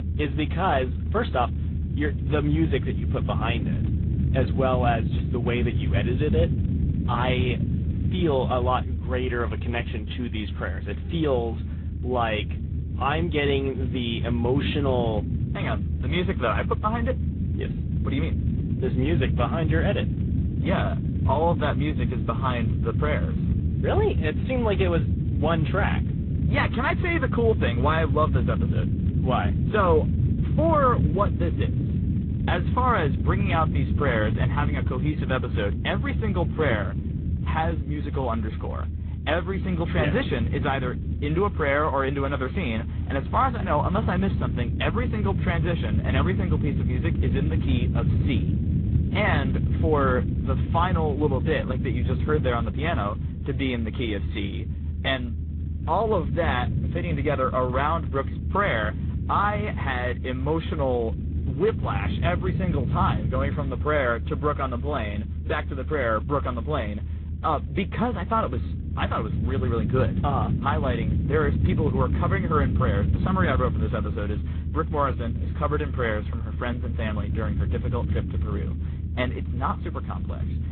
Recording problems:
high frequencies cut off; severe; nothing above 3.5 kHz
garbled, watery; slightly
low rumble; noticeable; throughout; 10 dB below the speech

